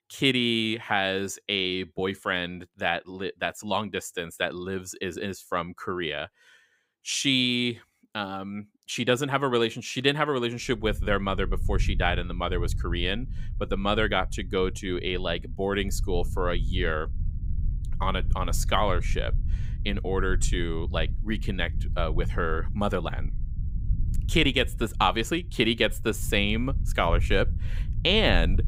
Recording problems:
low rumble; faint; from 11 s on; 20 dB below the speech

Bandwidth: 15.5 kHz